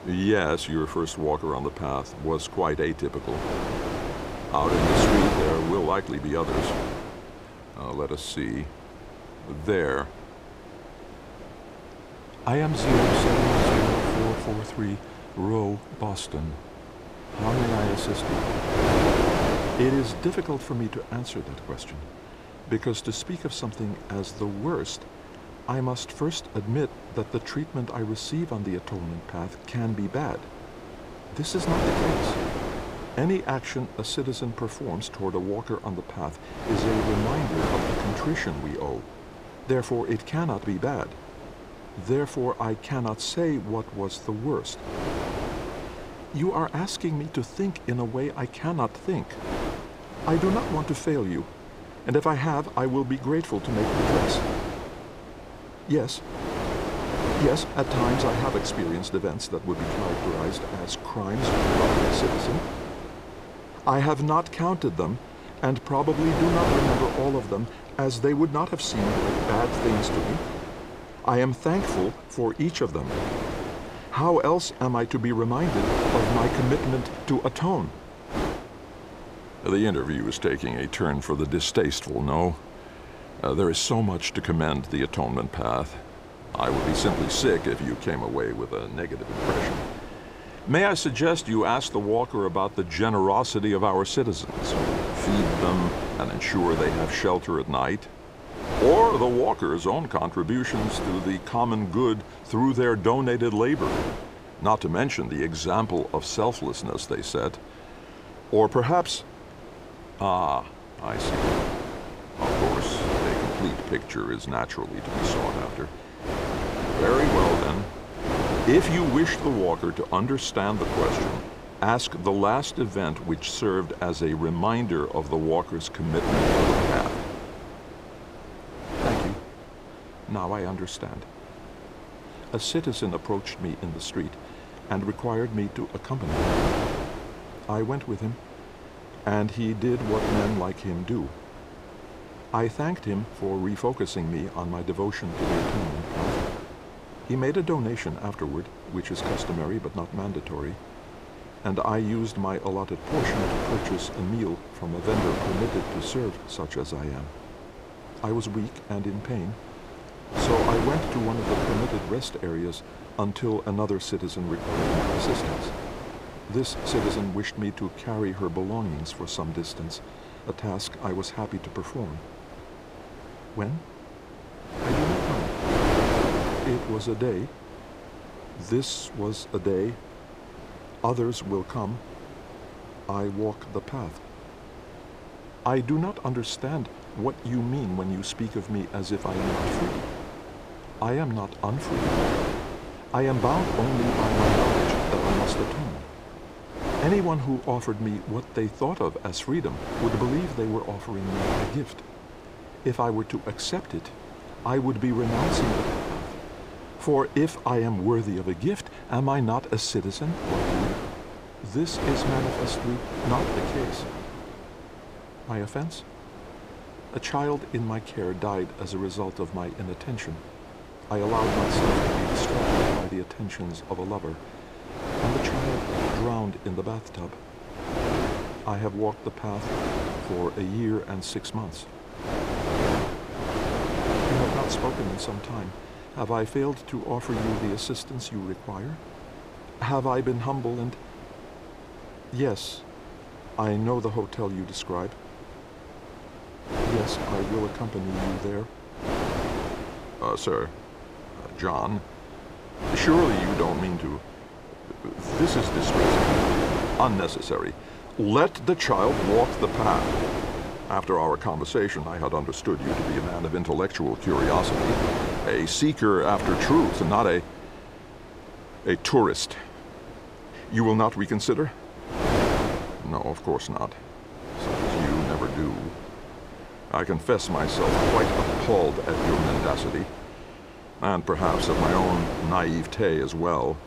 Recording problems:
wind noise on the microphone; heavy; 1 dB below the speech

